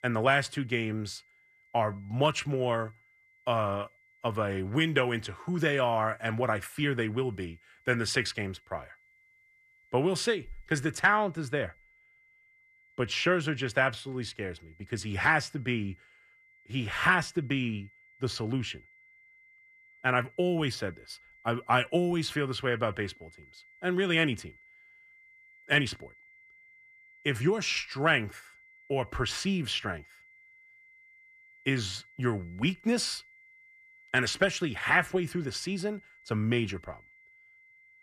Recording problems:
high-pitched whine; faint; throughout; 2 kHz, 30 dB below the speech

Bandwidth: 14.5 kHz